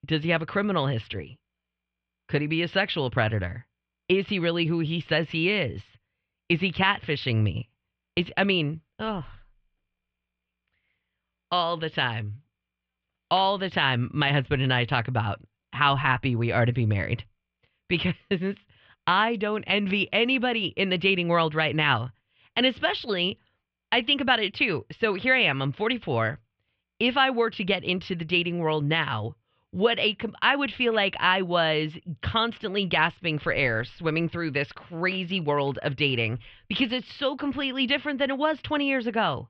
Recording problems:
muffled; very; fading above 3 kHz

